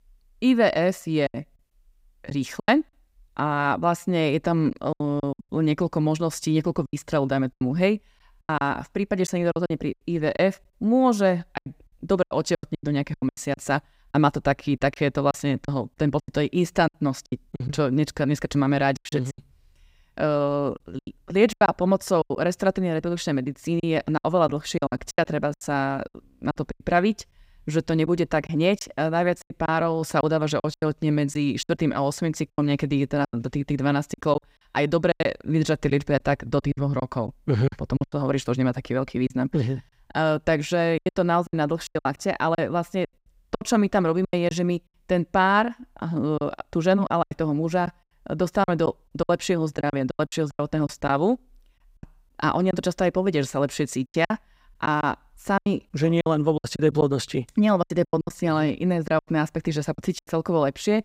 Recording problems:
choppy; very; 12% of the speech affected

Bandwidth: 15.5 kHz